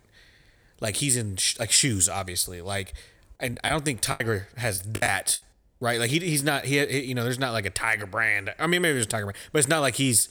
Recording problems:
choppy; very; from 3.5 to 5.5 s; 14% of the speech affected

